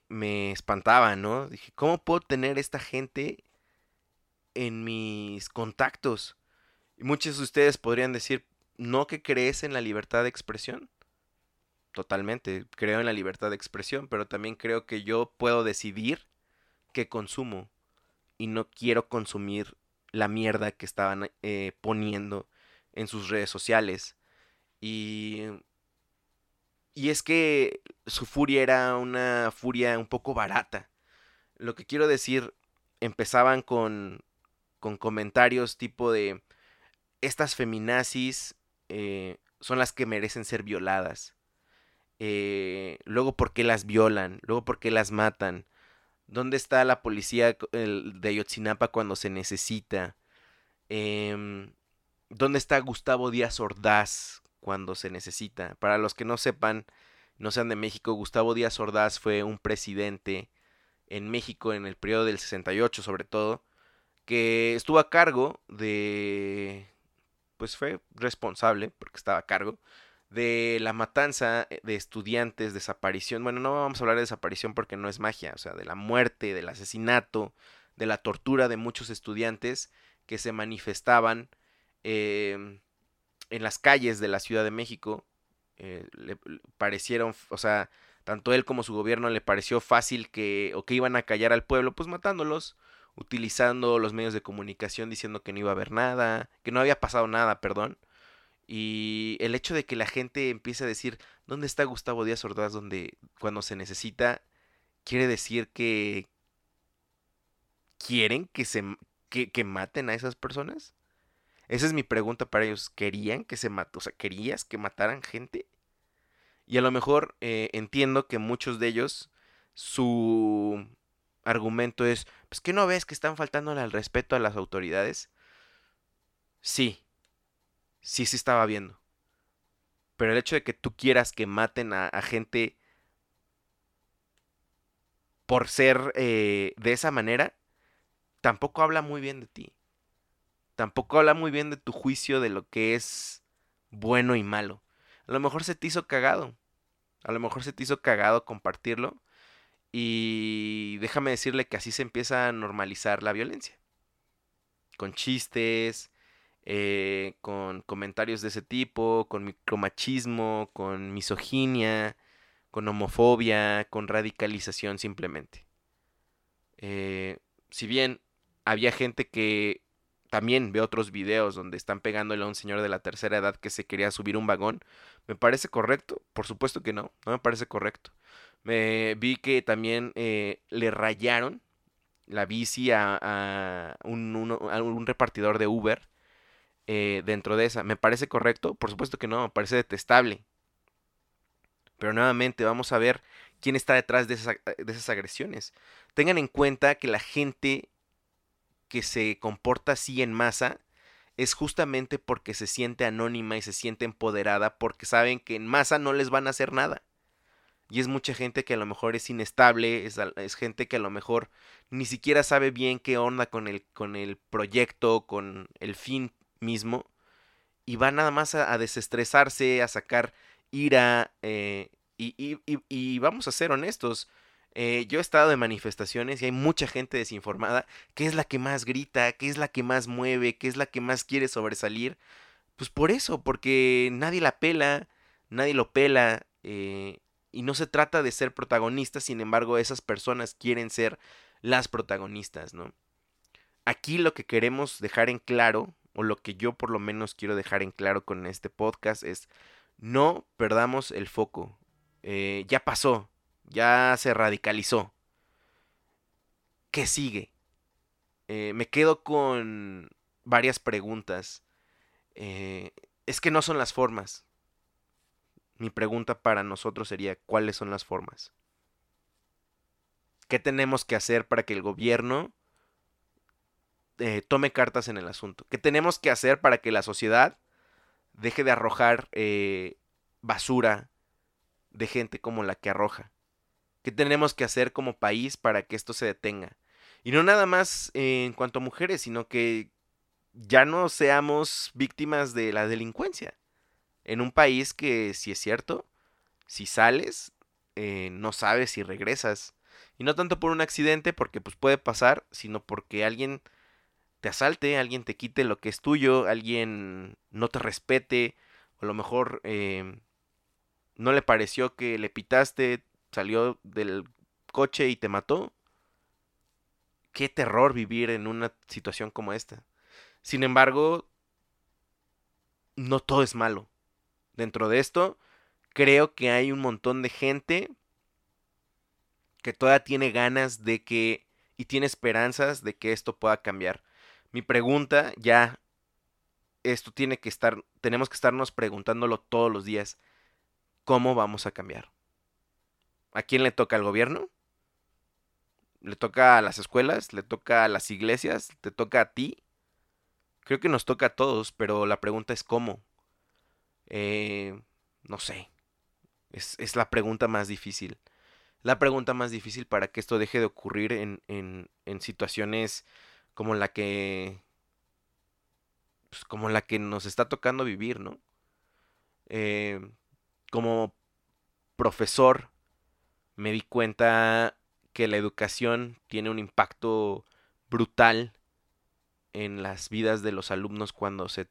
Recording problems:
none

